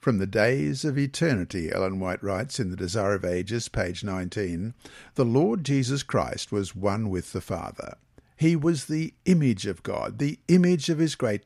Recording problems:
none

